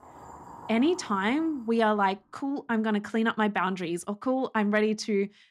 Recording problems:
household noises; noticeable; until 1.5 s; 20 dB below the speech

